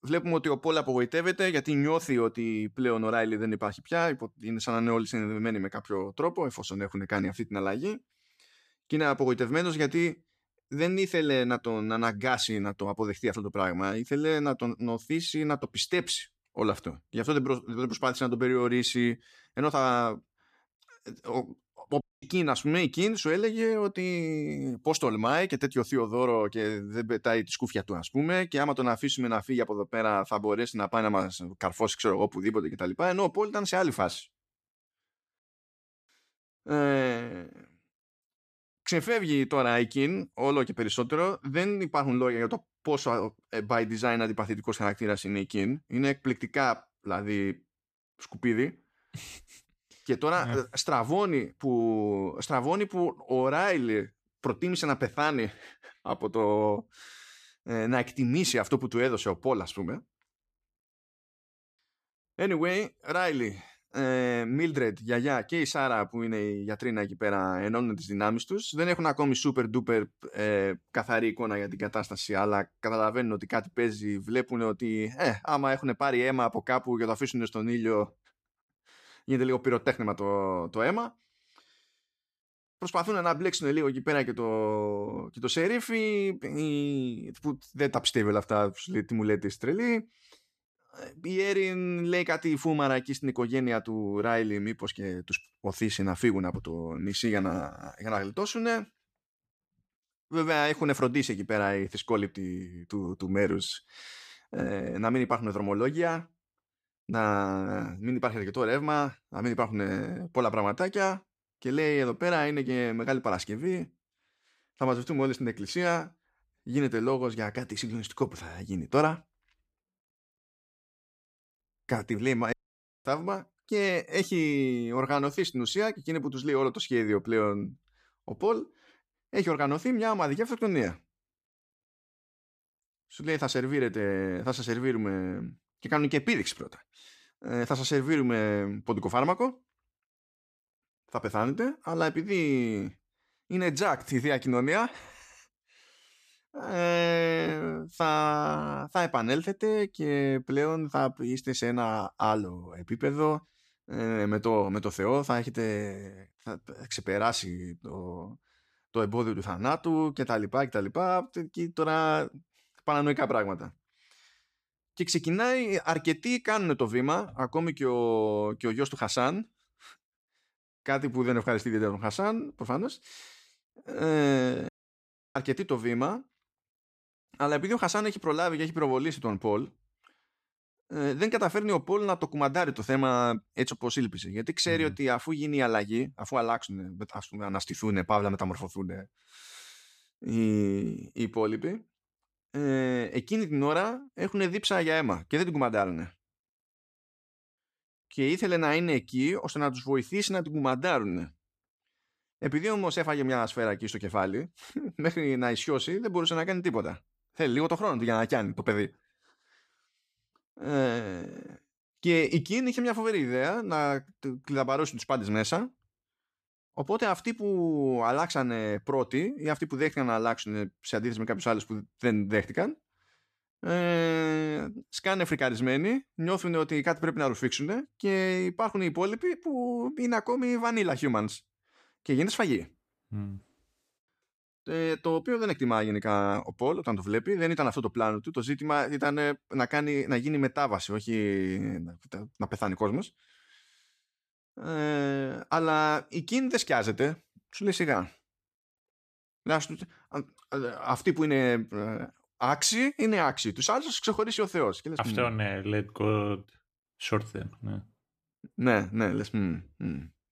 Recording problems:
audio cutting out; at 22 s, at 2:03 for 0.5 s and at 2:55 for 0.5 s

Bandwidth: 14.5 kHz